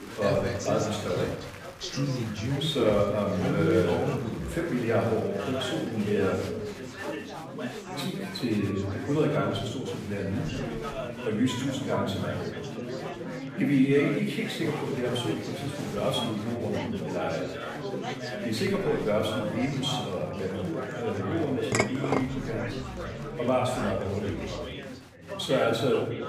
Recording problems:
off-mic speech; far
room echo; noticeable; dies away in 0.9 s
chatter from many people; loud; throughout; 6 dB below the speech
background music; noticeable; from 20 s on; 20 dB below the speech
clattering dishes; loud; at 22 s; peak 2 dB above the speech

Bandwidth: 15 kHz